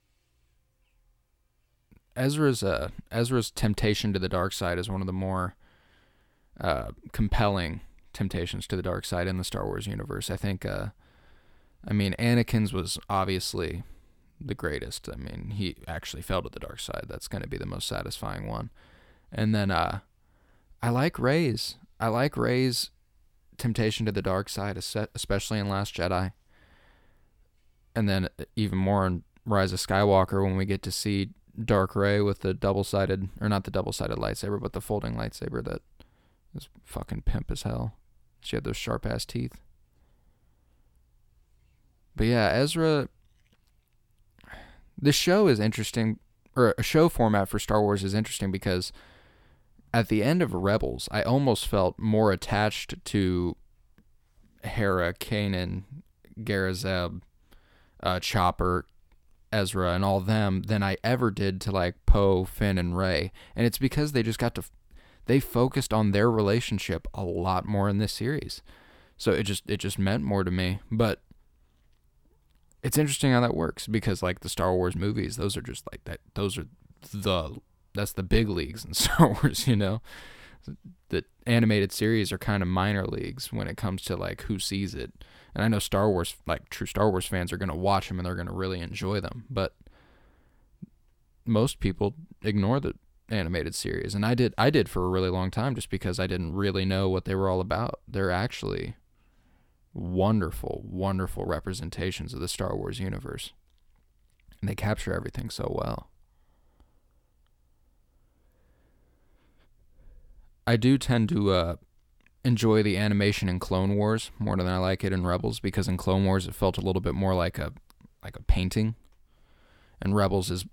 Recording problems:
none

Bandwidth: 17 kHz